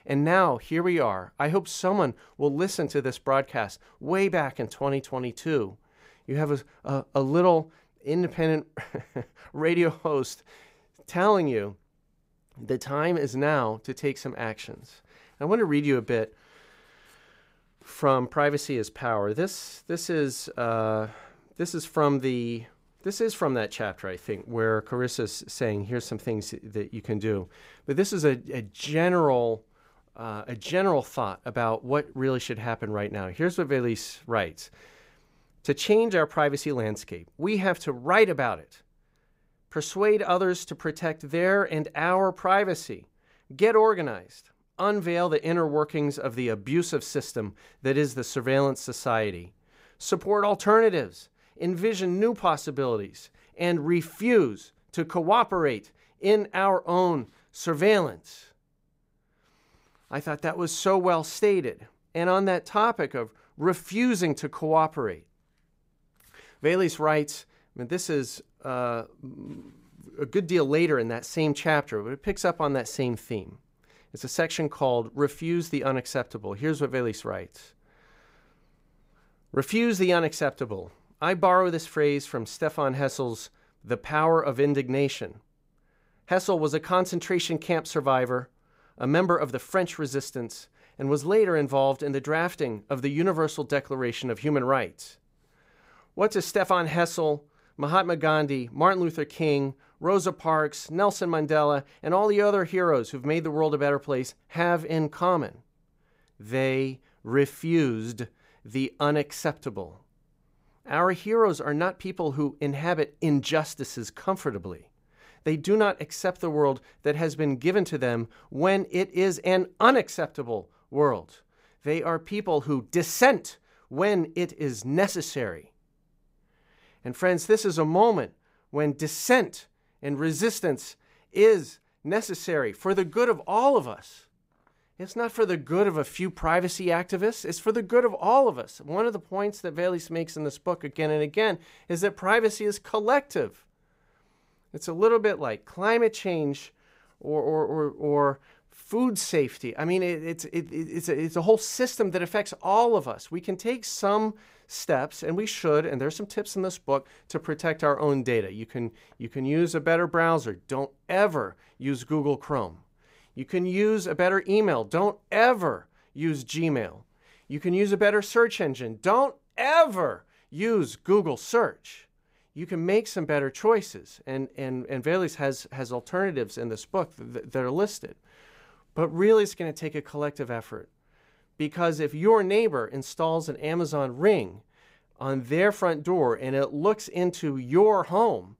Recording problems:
none

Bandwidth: 15.5 kHz